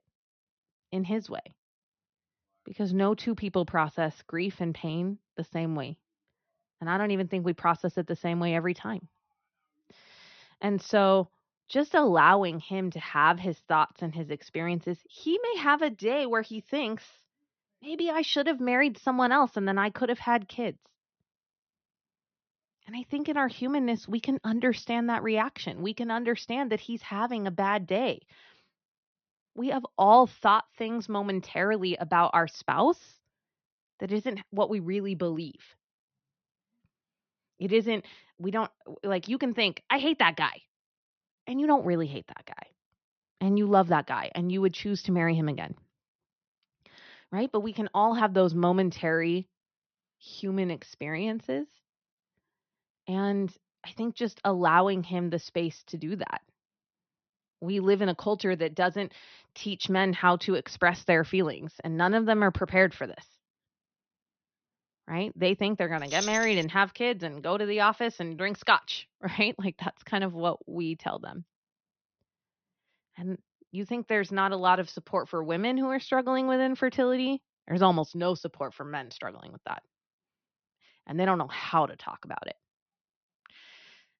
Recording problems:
high frequencies cut off; noticeable; nothing above 6.5 kHz
jangling keys; noticeable; at 1:06; peak 5 dB below the speech

